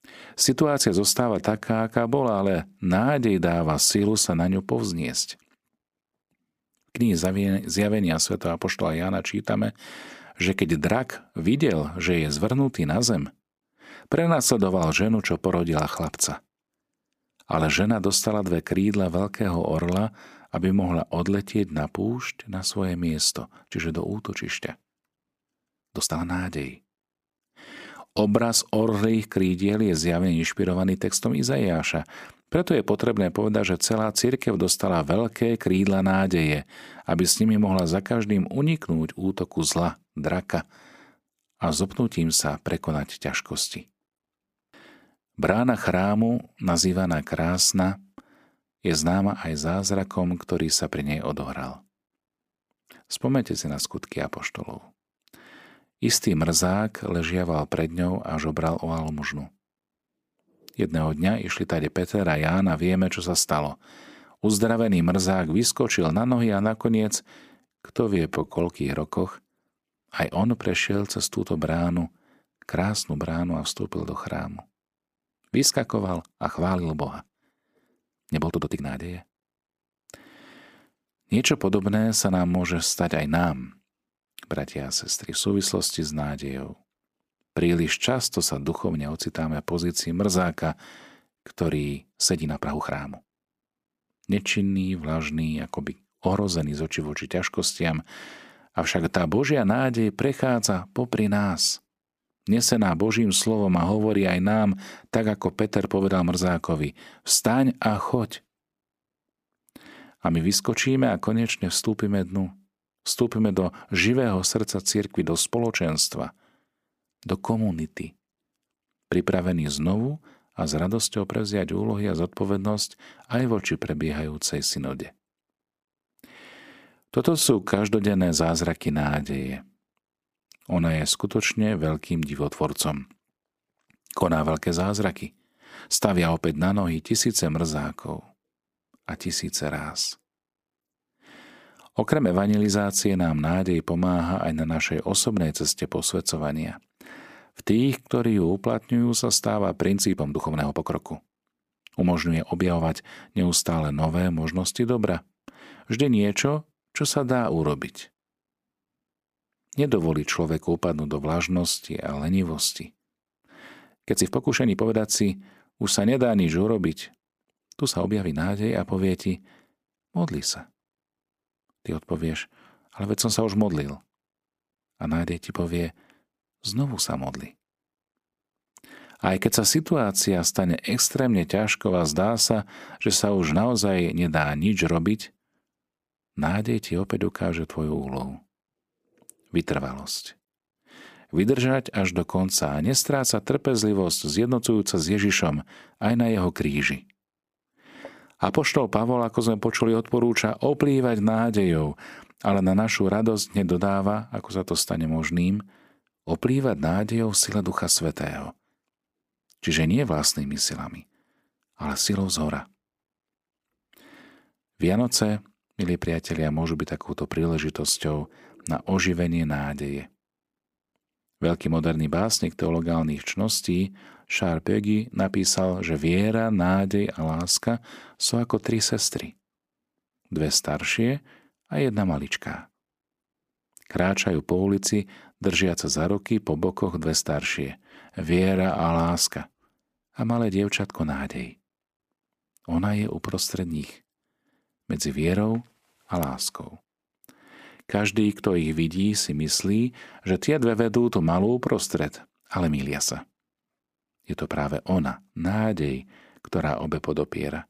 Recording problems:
uneven, jittery; strongly; from 1.5 s to 4:03

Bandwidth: 15 kHz